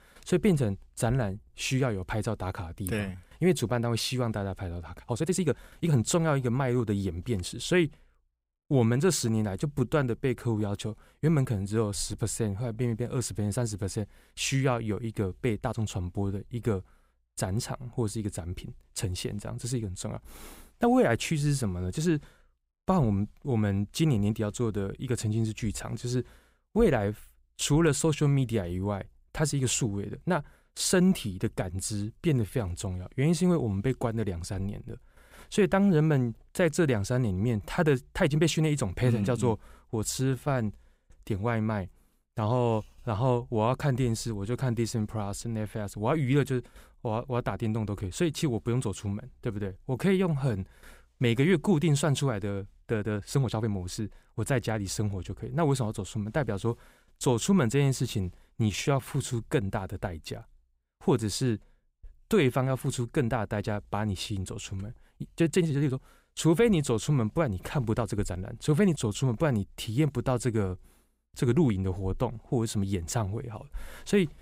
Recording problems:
uneven, jittery; strongly; from 5 s to 1:09

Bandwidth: 15.5 kHz